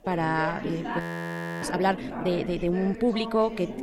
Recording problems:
background chatter; loud; throughout; 4 voices, 7 dB below the speech
audio freezing; at 1 s for 0.5 s

